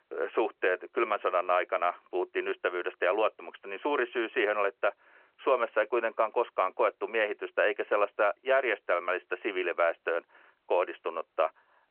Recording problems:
phone-call audio

